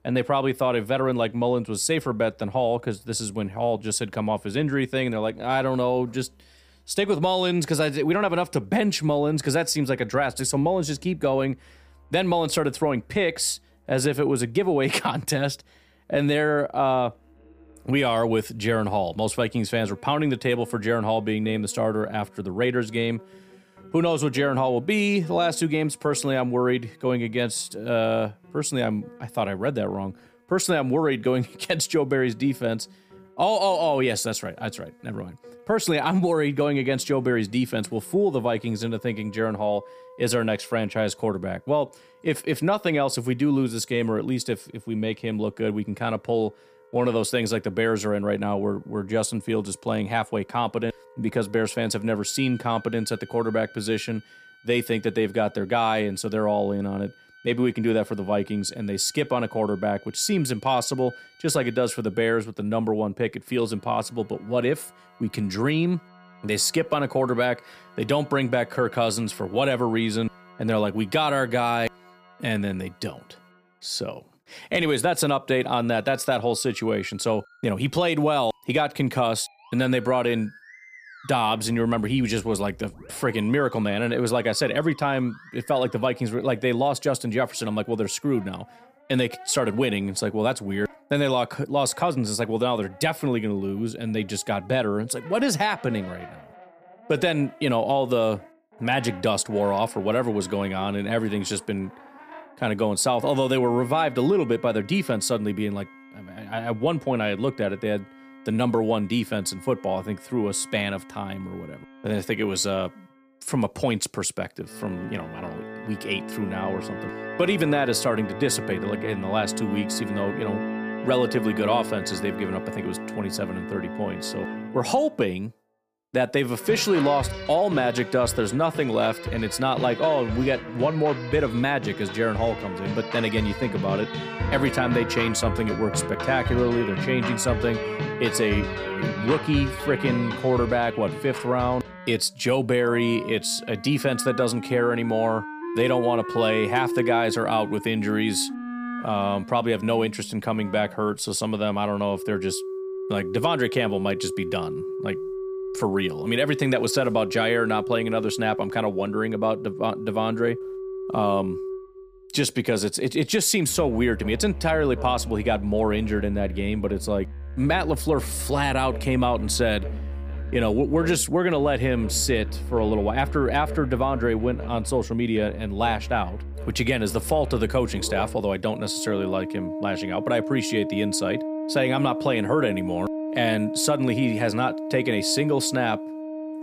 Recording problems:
background music; loud; throughout; 9 dB below the speech

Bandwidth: 15 kHz